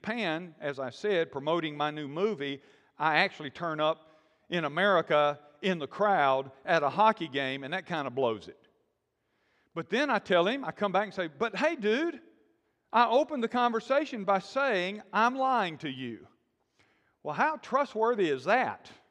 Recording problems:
none

